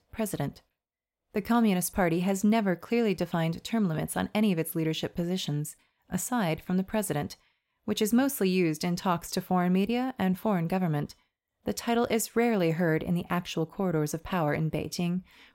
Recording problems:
none

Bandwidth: 16 kHz